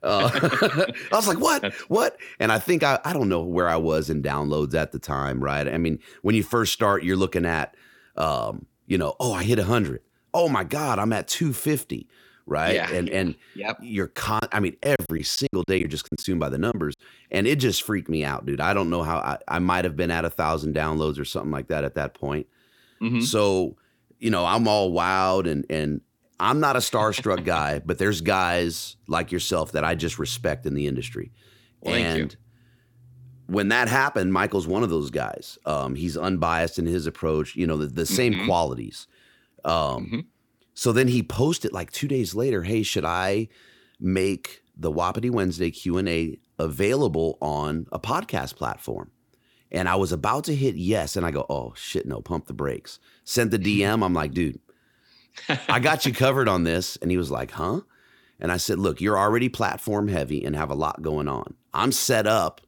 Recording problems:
choppy; very; from 14 to 17 s; 12% of the speech affected

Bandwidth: 18 kHz